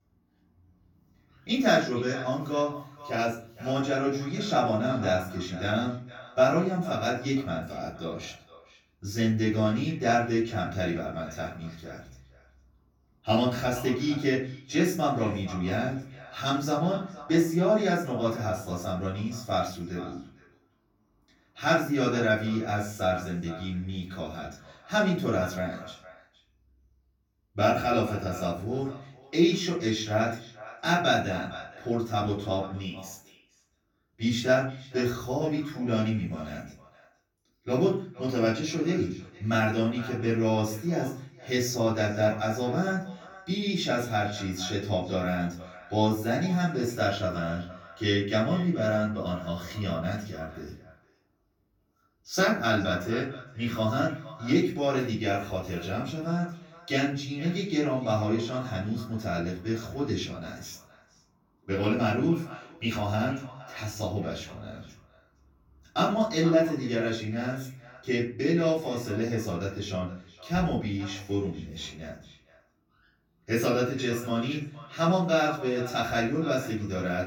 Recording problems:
off-mic speech; far
echo of what is said; faint; throughout; 460 ms later, 20 dB below the speech
room echo; slight; dies away in 0.4 s

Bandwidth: 17.5 kHz